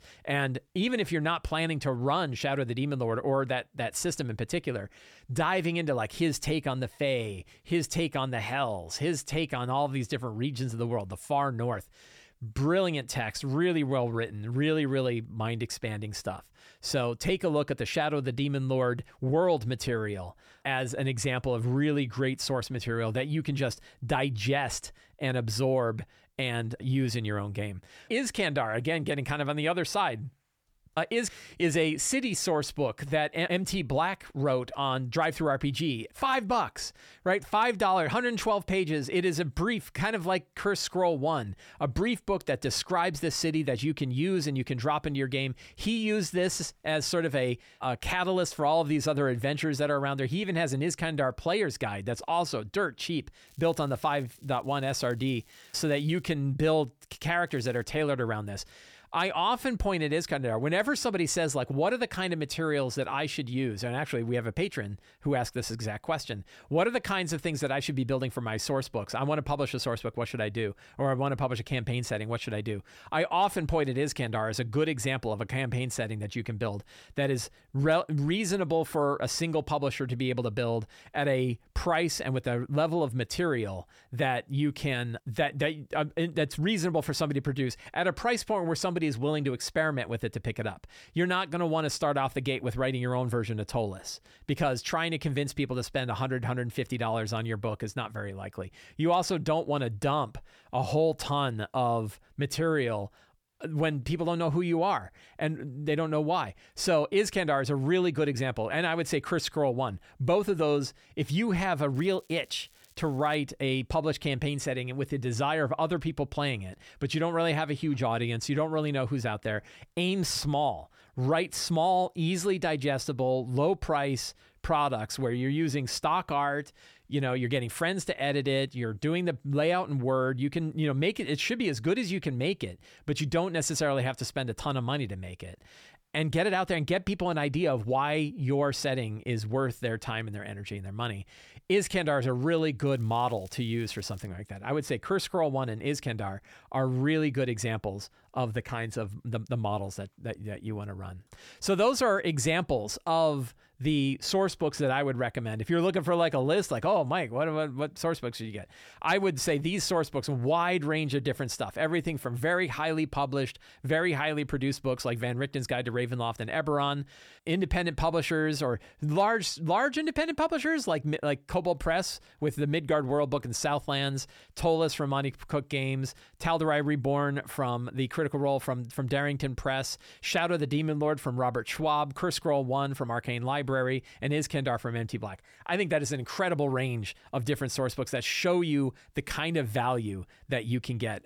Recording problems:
crackling; faint; 4 times, first at 53 s; 30 dB below the speech

